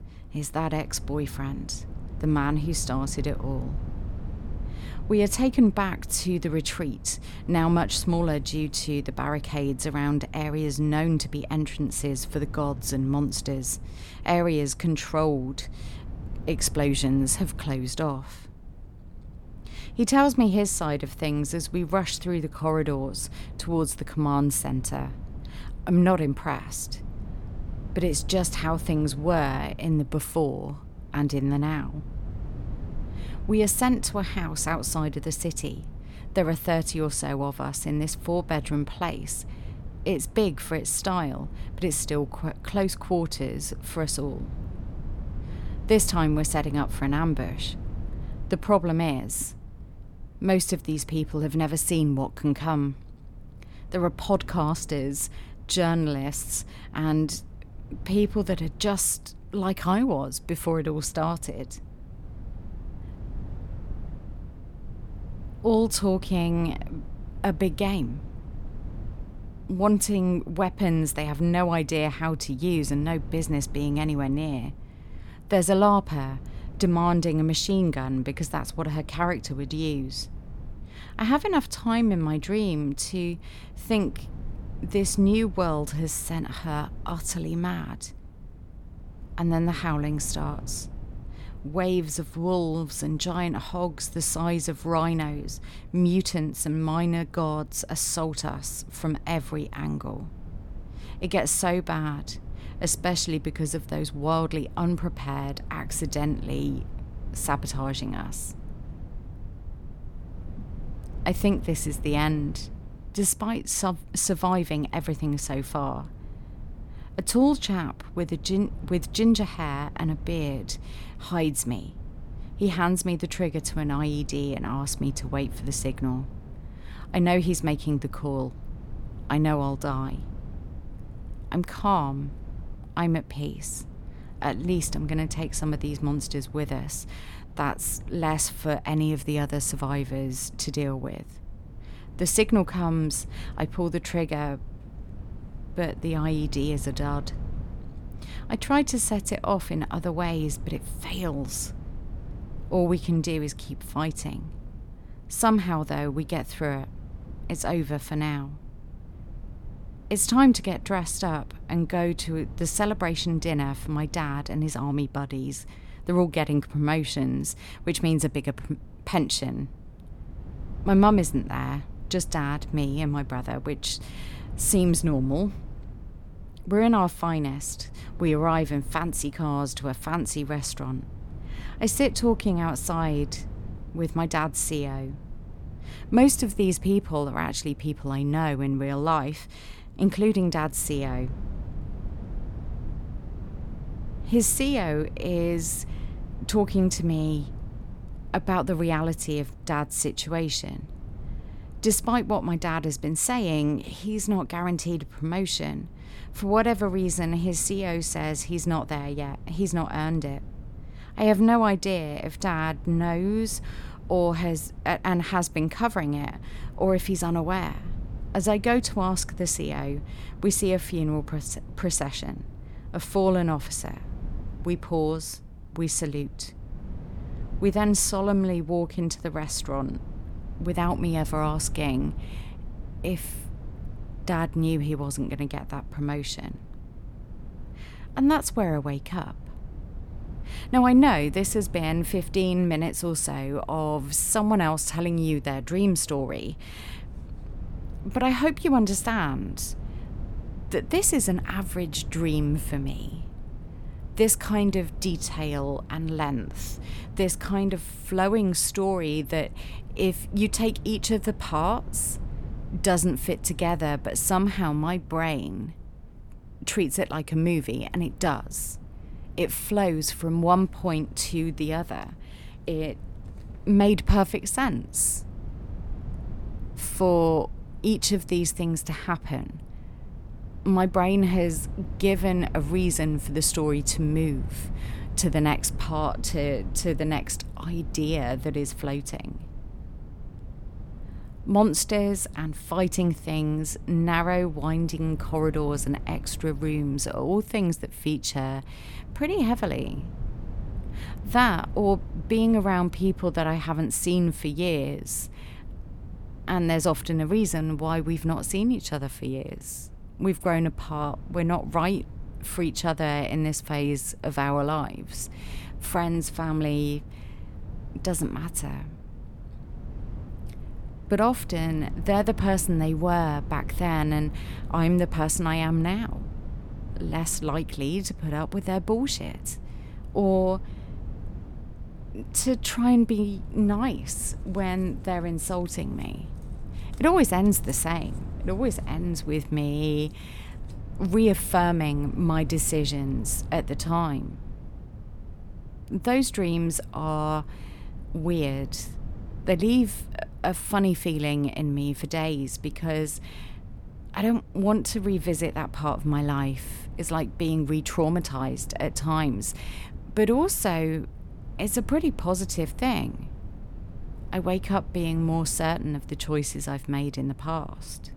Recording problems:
low rumble; faint; throughout; 25 dB below the speech

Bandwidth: 18 kHz